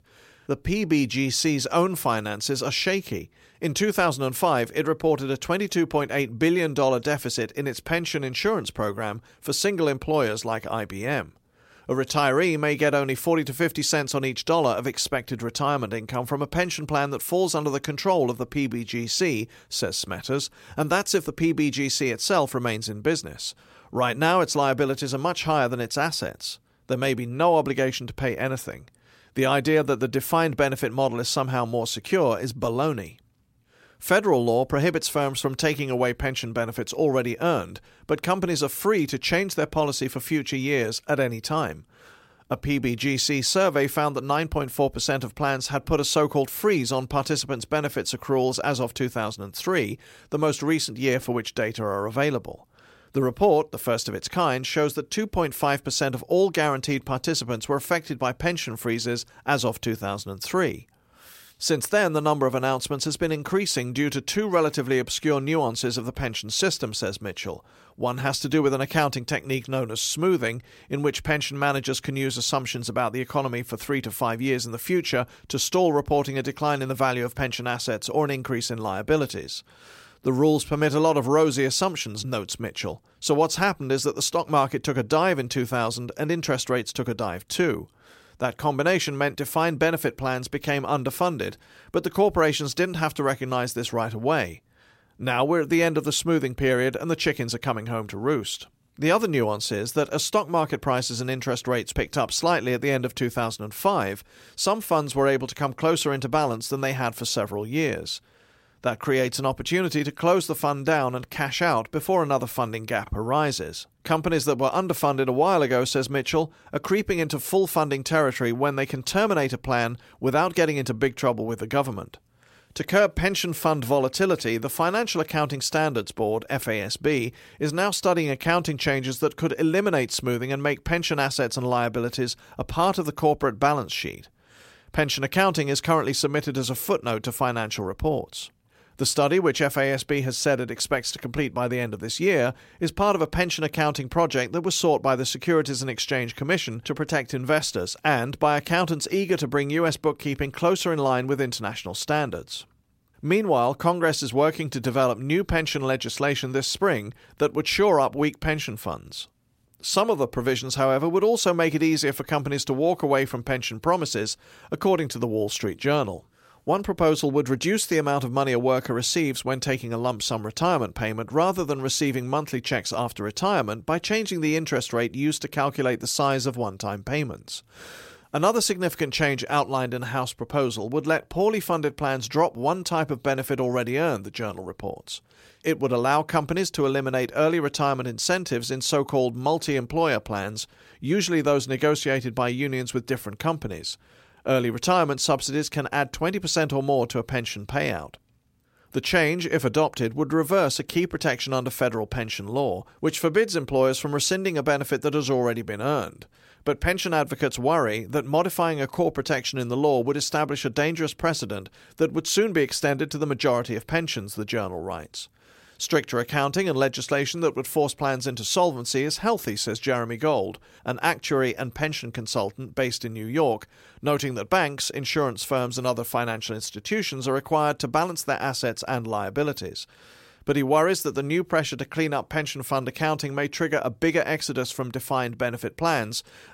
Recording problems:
none

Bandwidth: 16 kHz